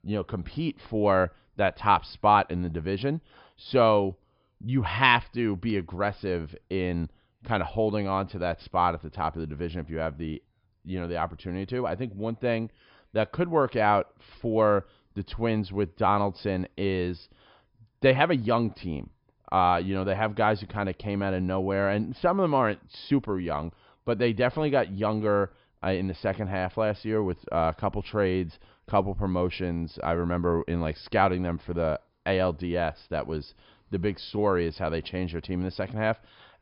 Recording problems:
high frequencies cut off; noticeable; nothing above 5.5 kHz

